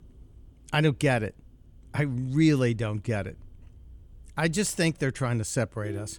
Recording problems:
traffic noise; faint; throughout; 25 dB below the speech

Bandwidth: 18.5 kHz